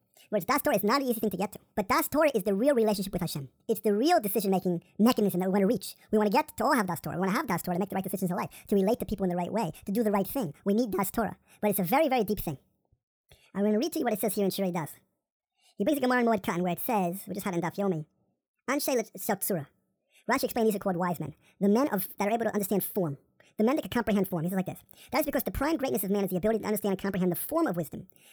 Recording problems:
wrong speed and pitch; too fast and too high; 1.6 times normal speed

